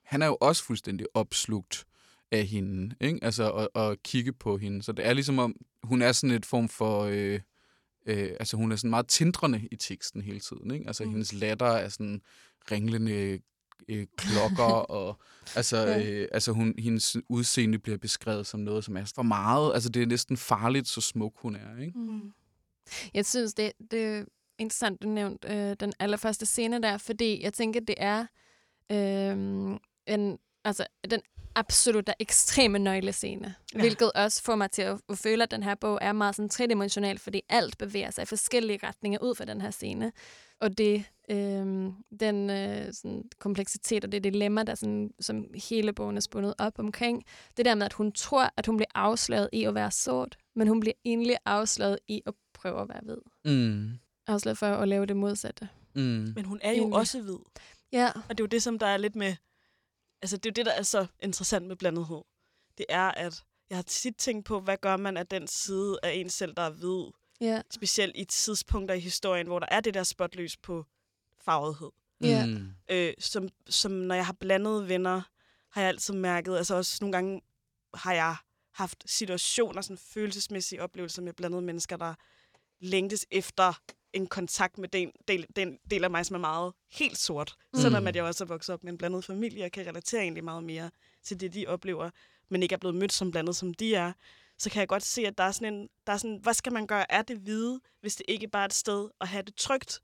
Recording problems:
none

